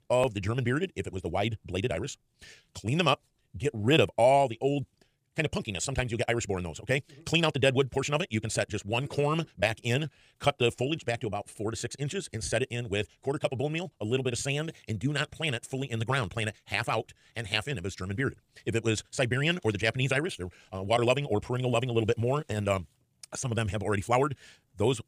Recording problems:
wrong speed, natural pitch; too fast; 1.7 times normal speed

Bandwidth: 15 kHz